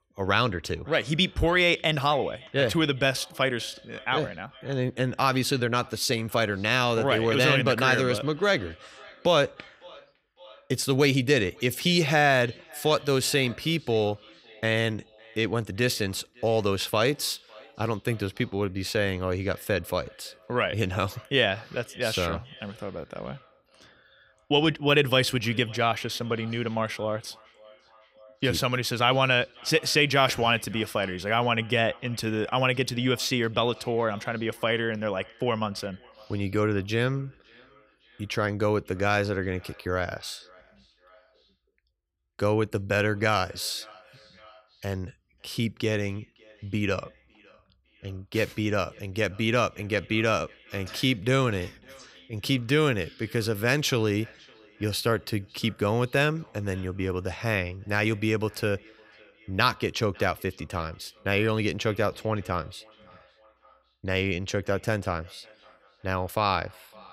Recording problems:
echo of what is said; faint; throughout; 560 ms later, 25 dB below the speech

